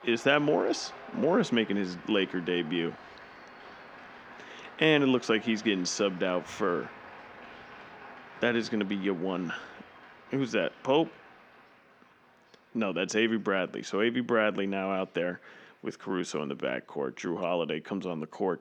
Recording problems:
crowd noise; noticeable; throughout; 20 dB below the speech

